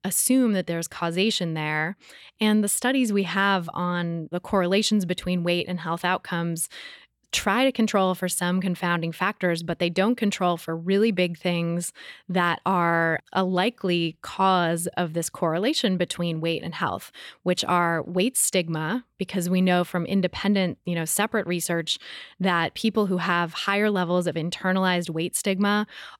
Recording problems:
none

